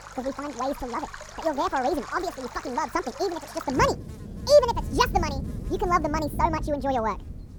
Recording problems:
wrong speed and pitch; too fast and too high; 1.7 times normal speed
muffled; slightly; fading above 1.5 kHz
rain or running water; noticeable; throughout; 10 dB below the speech
electrical hum; faint; throughout; 50 Hz, 30 dB below the speech

